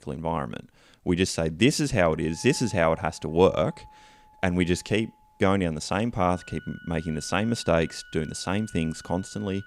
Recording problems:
background music; faint; from 2.5 s on; 25 dB below the speech

